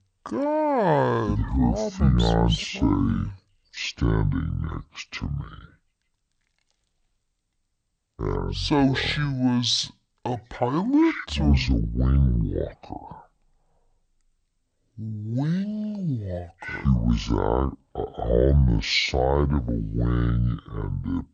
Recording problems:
wrong speed and pitch; too slow and too low; 0.6 times normal speed

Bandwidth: 8.5 kHz